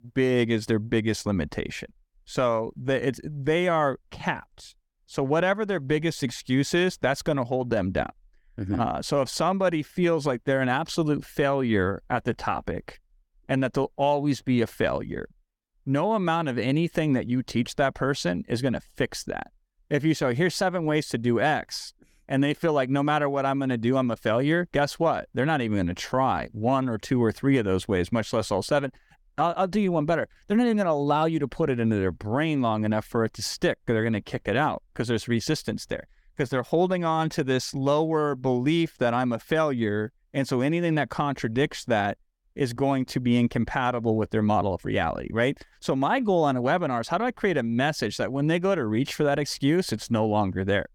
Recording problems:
none

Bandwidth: 18 kHz